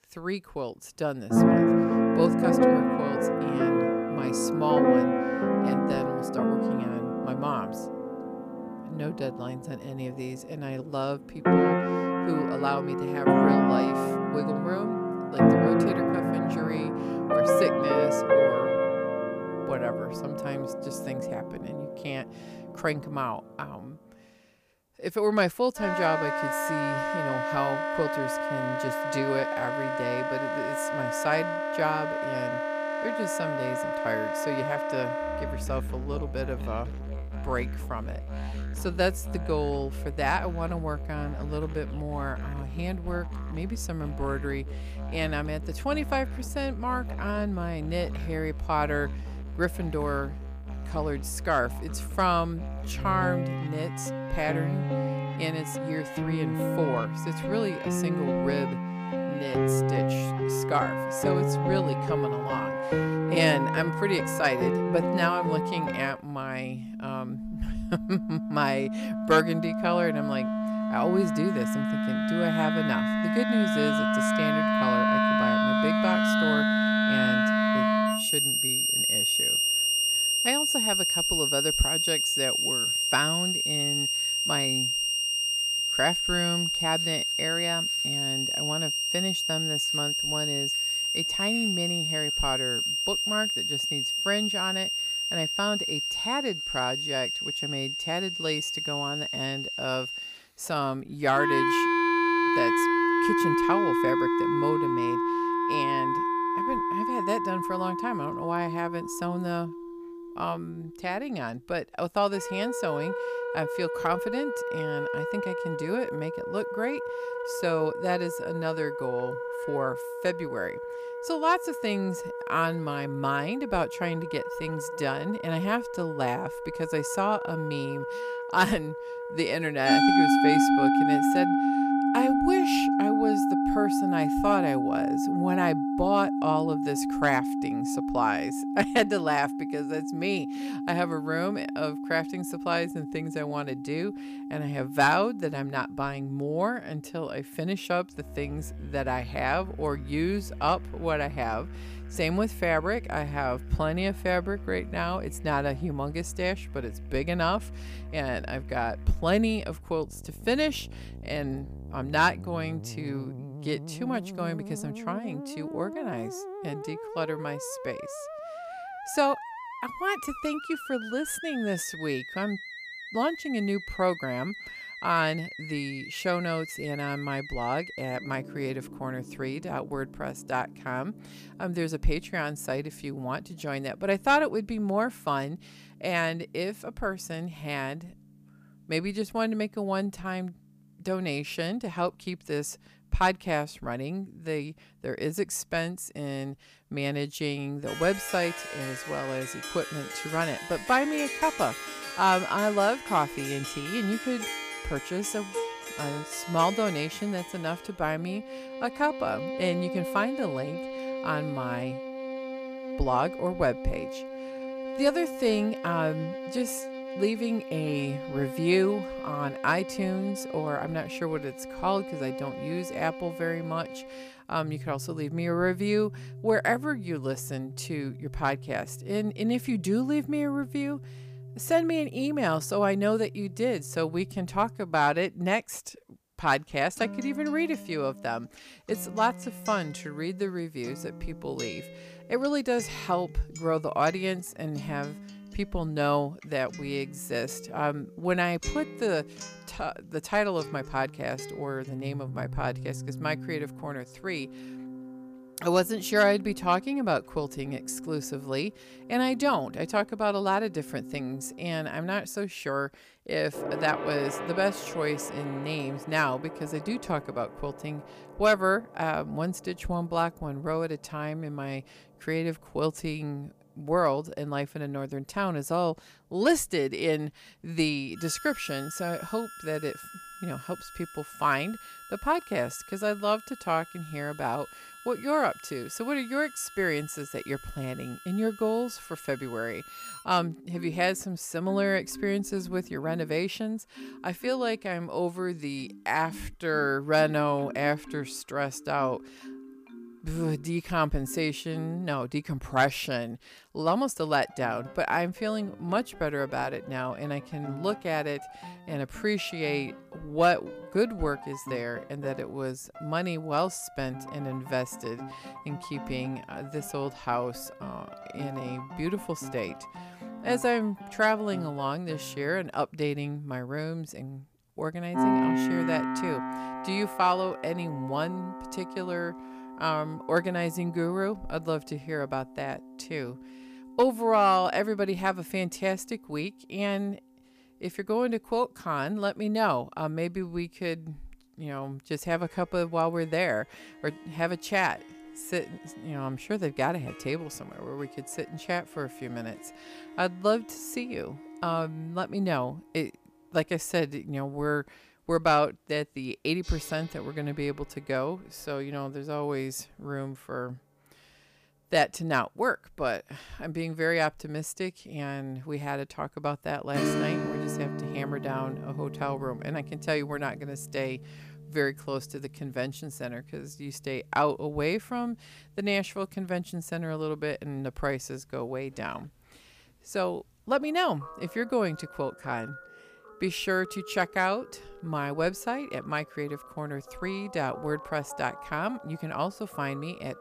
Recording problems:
background music; very loud; throughout; 1 dB above the speech

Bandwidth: 15 kHz